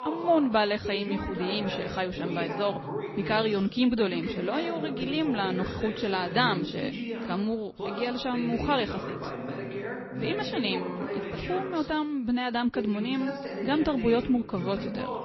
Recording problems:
garbled, watery; slightly
voice in the background; loud; throughout; 7 dB below the speech

